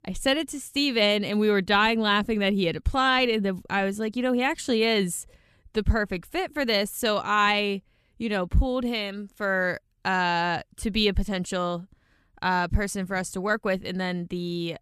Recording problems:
none

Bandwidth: 14 kHz